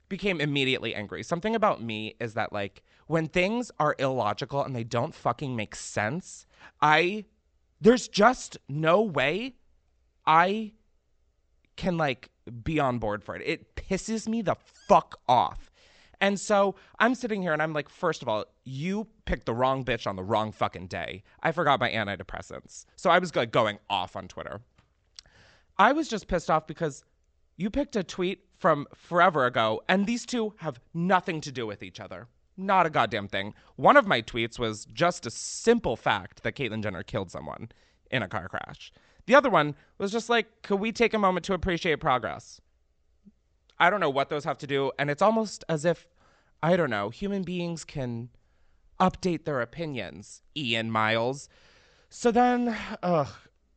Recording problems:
high frequencies cut off; noticeable; nothing above 8 kHz

